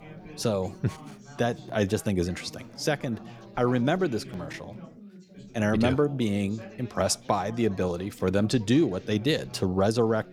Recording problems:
background chatter; noticeable; throughout; 4 voices, 20 dB below the speech

